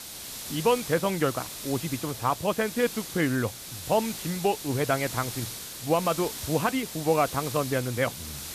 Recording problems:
high frequencies cut off; severe; nothing above 3.5 kHz
hiss; loud; throughout; 8 dB below the speech

